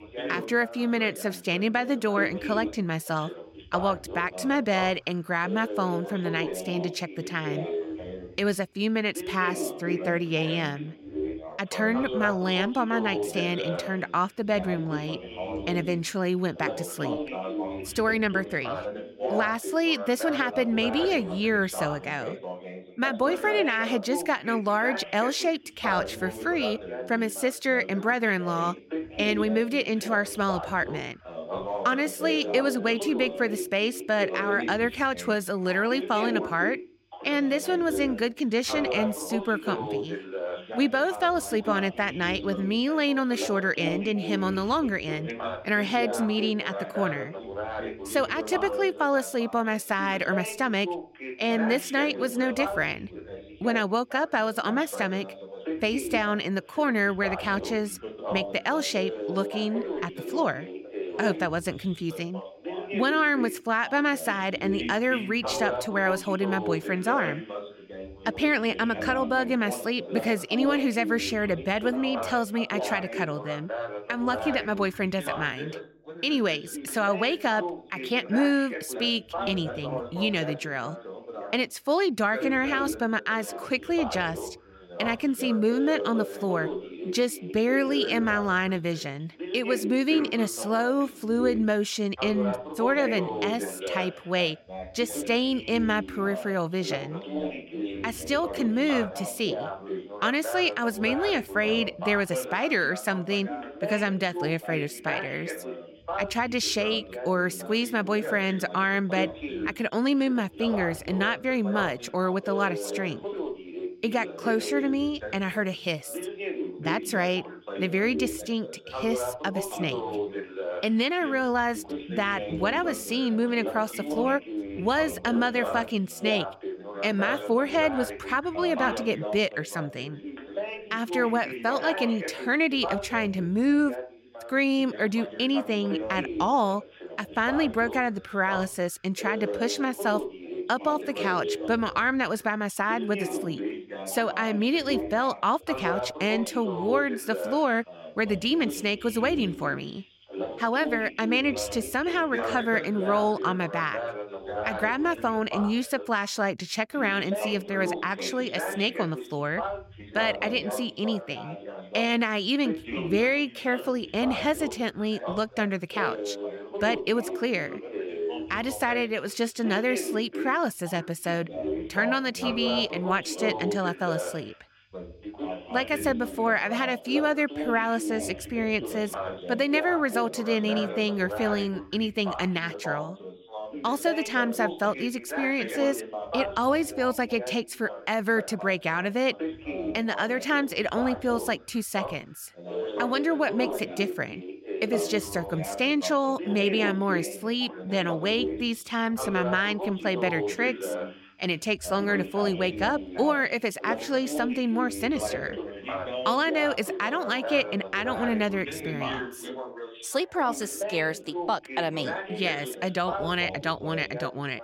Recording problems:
background chatter; loud; throughout; 2 voices, 8 dB below the speech

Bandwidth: 16.5 kHz